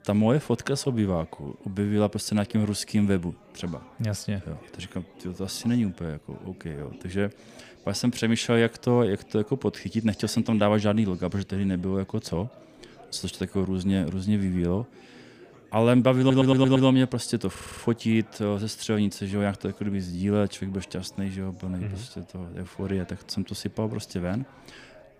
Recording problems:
chatter from many people; faint; throughout; 25 dB below the speech
audio stuttering; at 16 s and at 18 s

